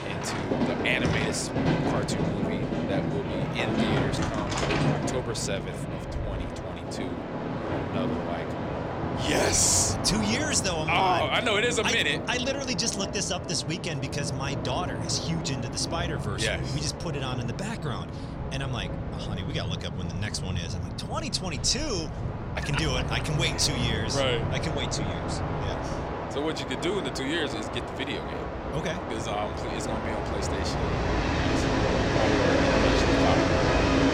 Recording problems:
train or aircraft noise; loud; throughout; as loud as the speech

